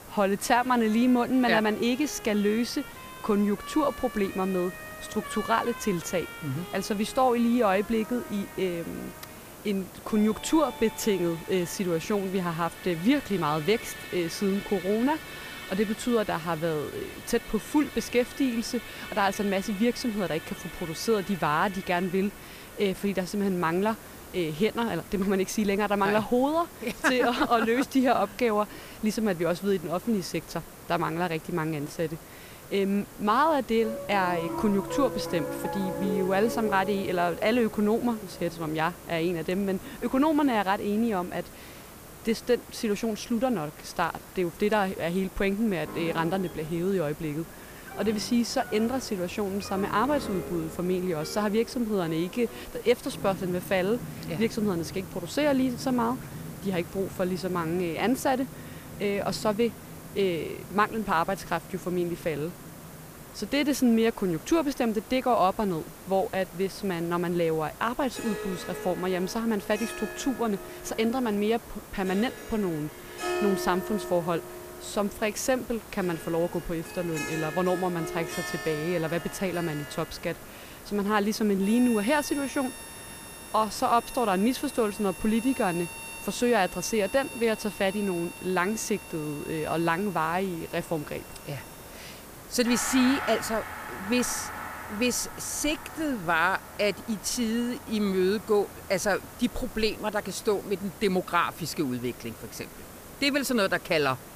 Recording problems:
background music; noticeable; throughout; 15 dB below the speech
hiss; noticeable; throughout; 15 dB below the speech

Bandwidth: 15 kHz